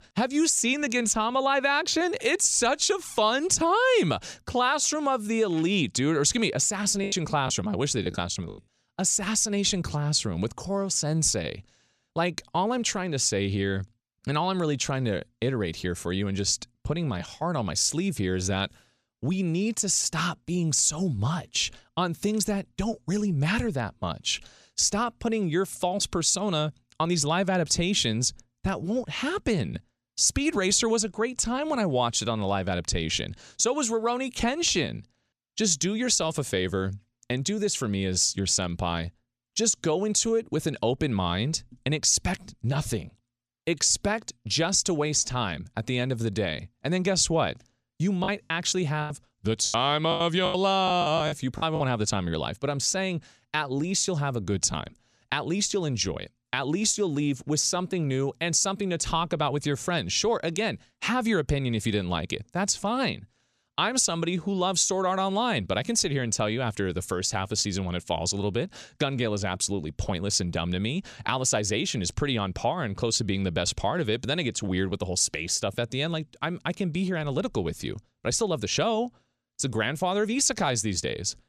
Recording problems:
choppy; very; from 7 to 8.5 s and from 48 to 52 s; 15% of the speech affected

